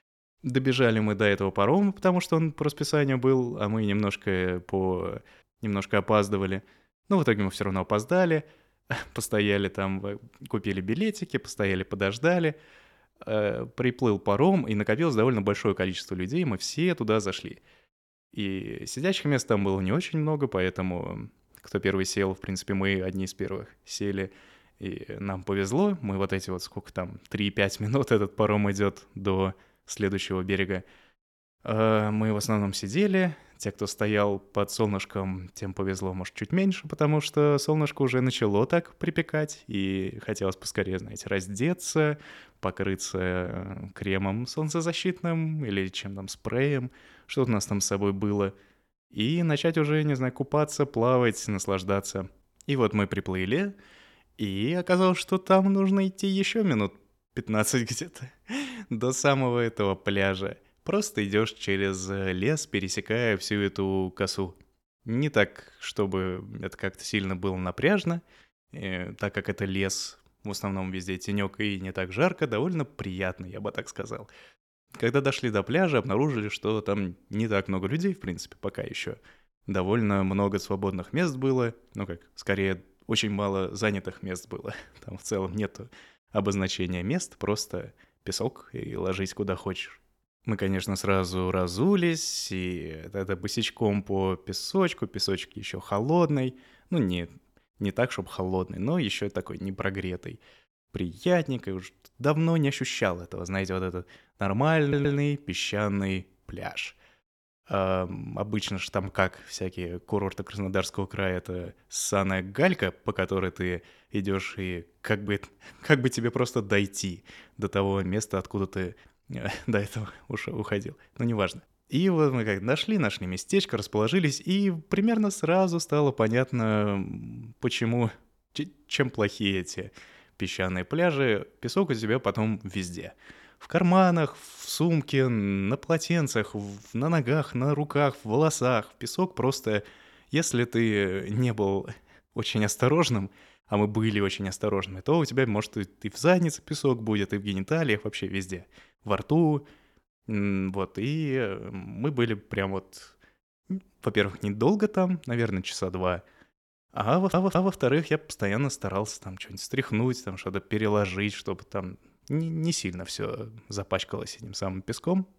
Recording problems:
audio stuttering; at 1:45 and at 2:37

